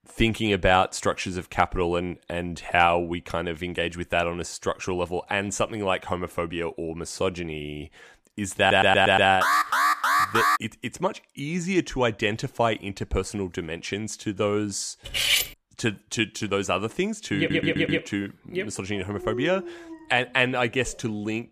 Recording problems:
audio stuttering; at 8.5 s and at 17 s
alarm; loud; from 9.5 to 11 s; peak 5 dB above the speech
clattering dishes; loud; at 15 s; peak 5 dB above the speech
dog barking; noticeable; from 19 s on; peak 7 dB below the speech

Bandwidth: 14.5 kHz